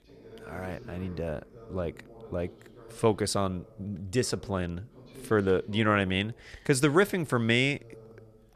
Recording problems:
voice in the background; faint; throughout; 20 dB below the speech

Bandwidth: 14 kHz